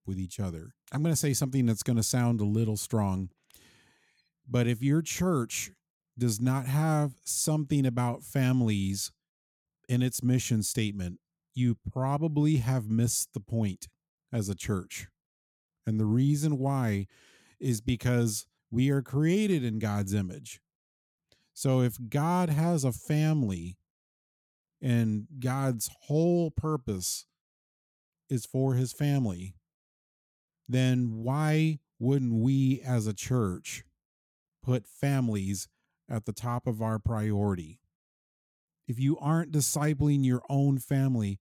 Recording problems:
none

